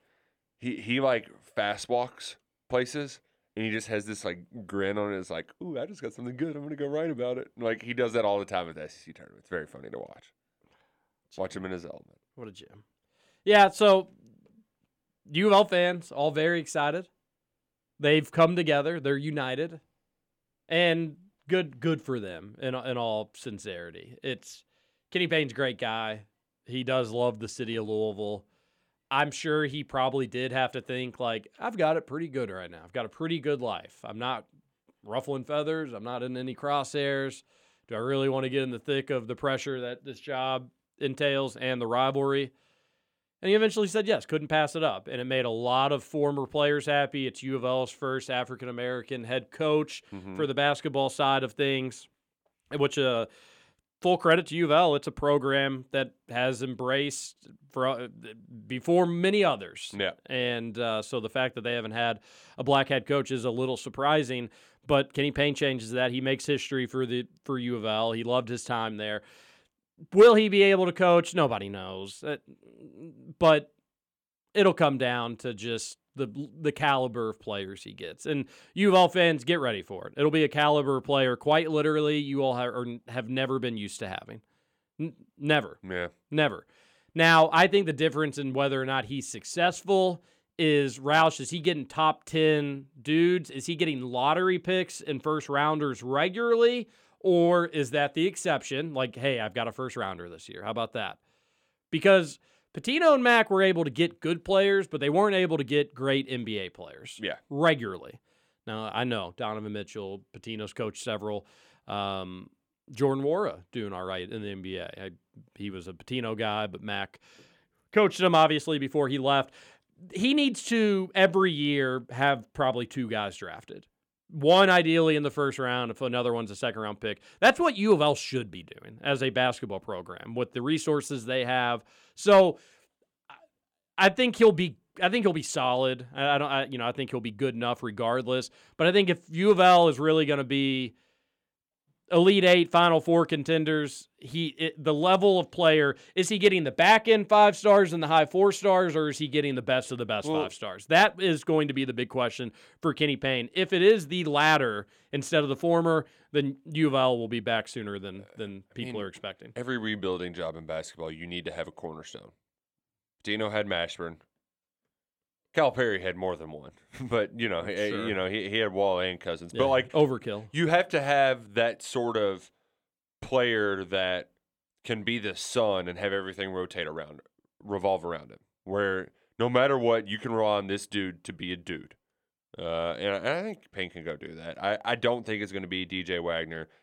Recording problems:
none

